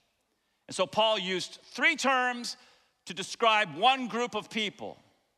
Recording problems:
none

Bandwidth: 13.5 kHz